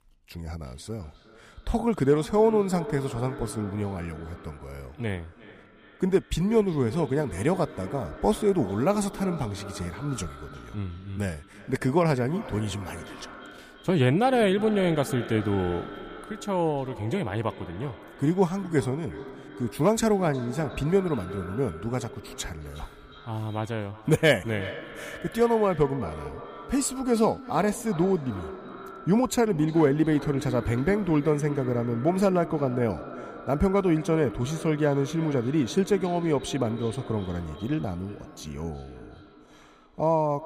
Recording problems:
echo of what is said; noticeable; throughout; 360 ms later, 15 dB below the speech

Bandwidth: 15 kHz